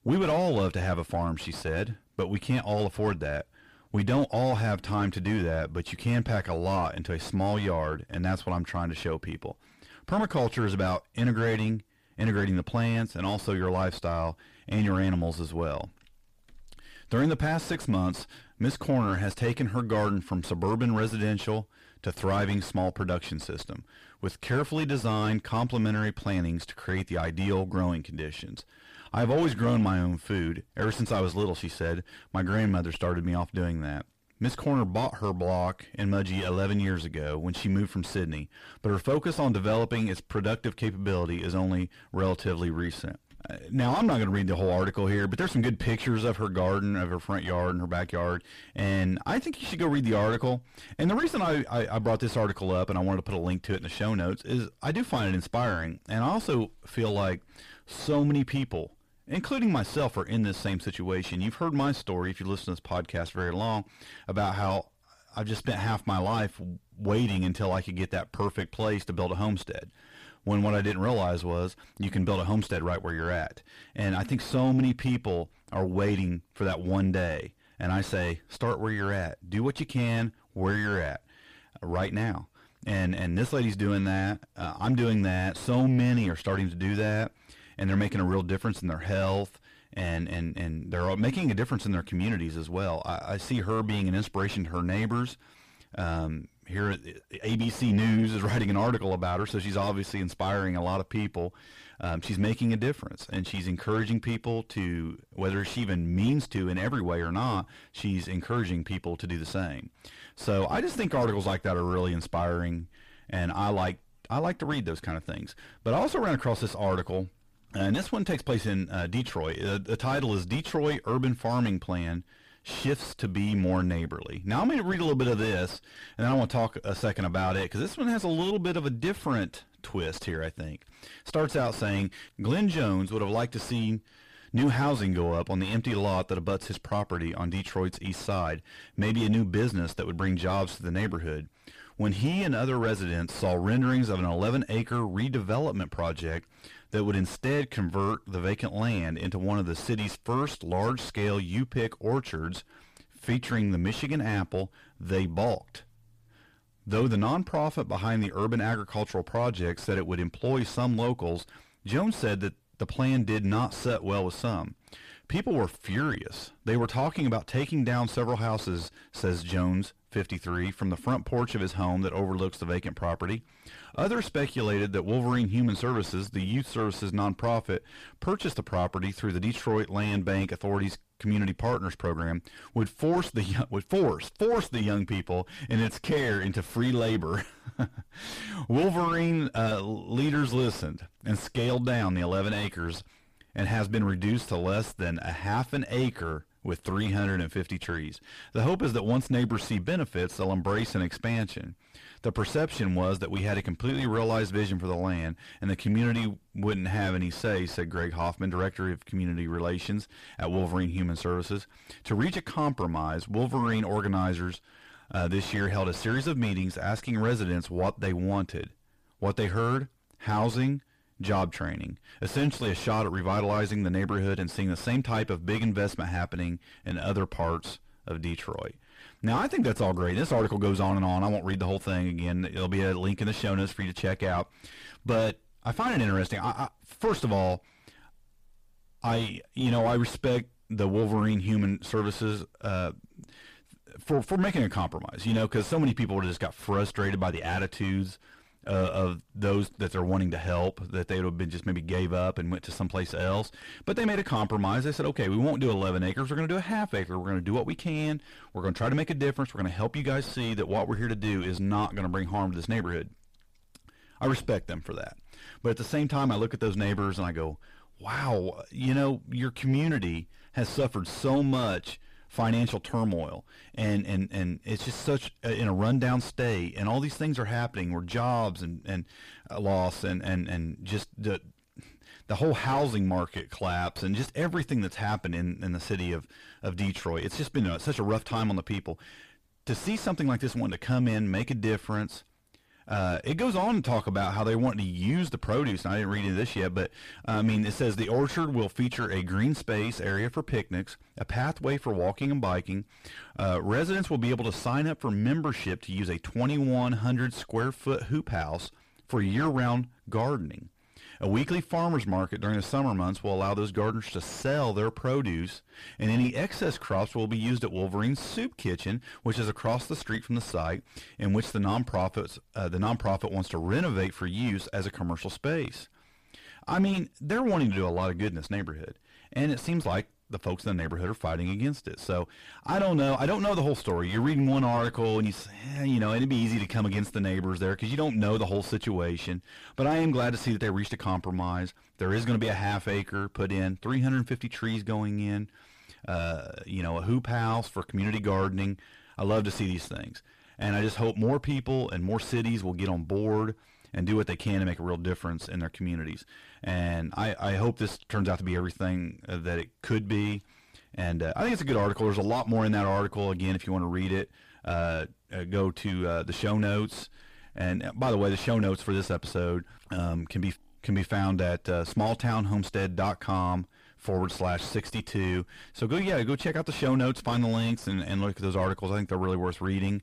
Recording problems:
distortion; heavy; 7 dB below the speech

